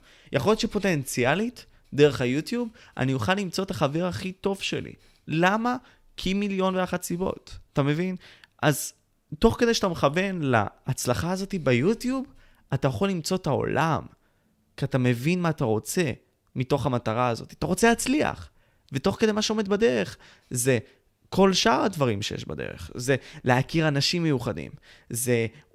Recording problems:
none

